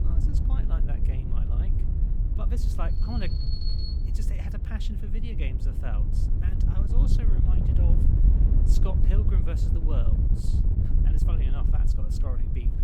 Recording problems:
wind noise on the microphone; heavy; 1 dB above the speech
alarm; loud; from 3 to 4 s; peak 4 dB above the speech

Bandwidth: 18 kHz